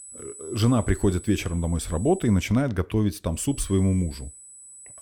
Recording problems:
high-pitched whine; noticeable; until 2.5 s and from 3.5 s on; 8 kHz, 15 dB below the speech

